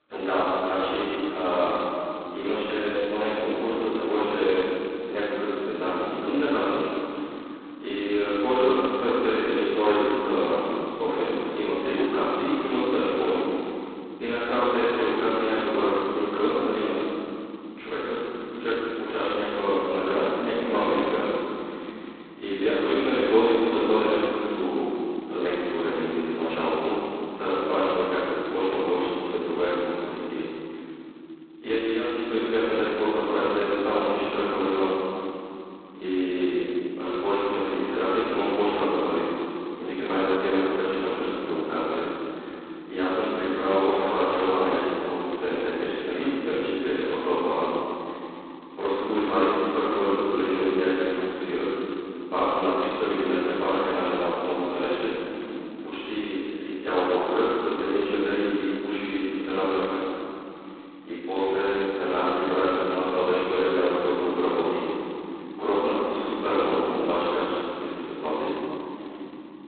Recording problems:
phone-call audio; poor line; nothing above 4 kHz
room echo; strong; dies away in 3 s
off-mic speech; far

